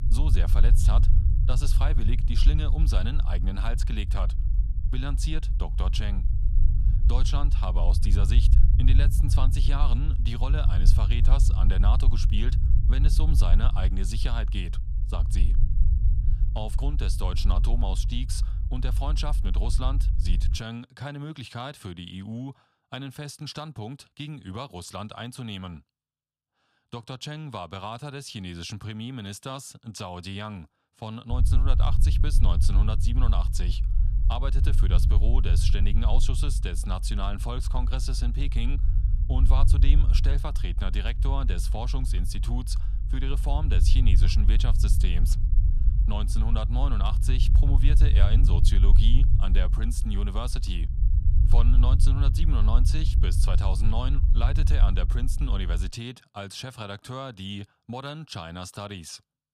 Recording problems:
low rumble; loud; until 21 s and from 31 to 56 s; 7 dB below the speech

